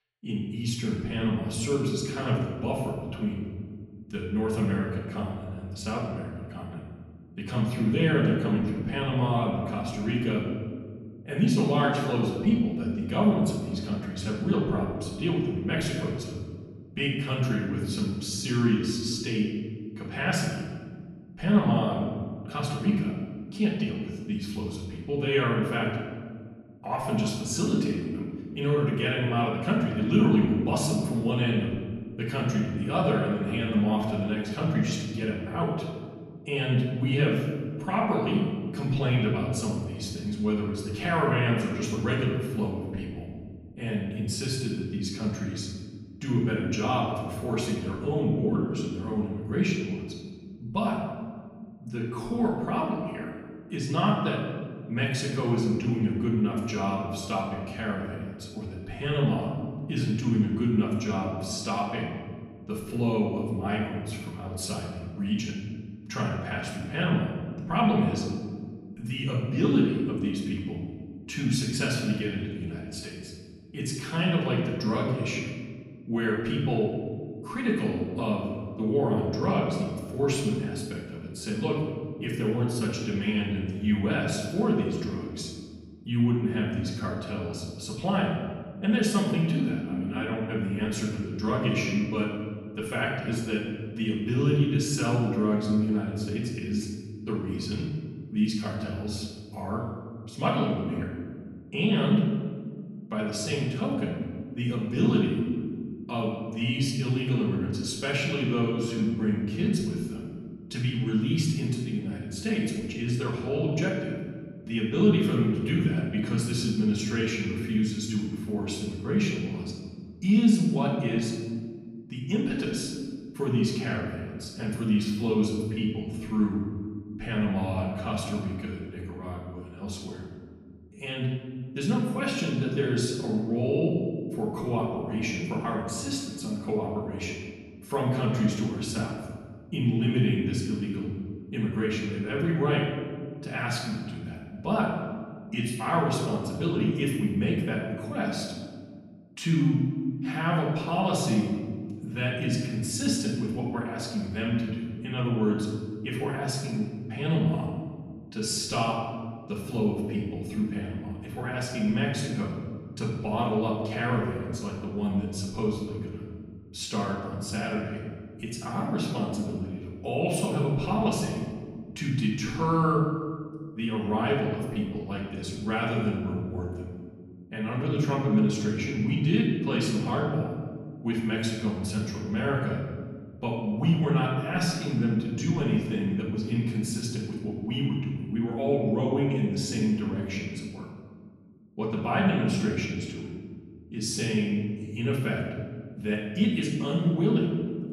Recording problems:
off-mic speech; far
room echo; noticeable; dies away in 1.8 s

